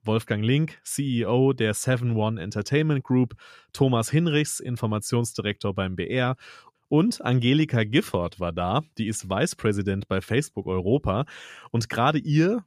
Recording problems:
none

